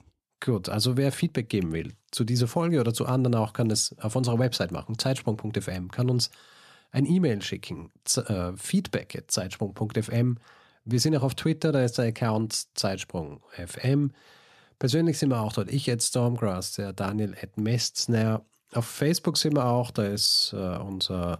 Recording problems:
none

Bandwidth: 13.5 kHz